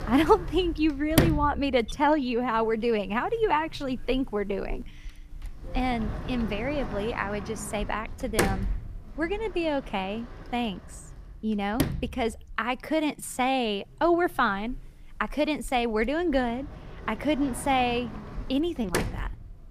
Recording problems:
household noises; loud; throughout; 7 dB below the speech

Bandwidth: 15 kHz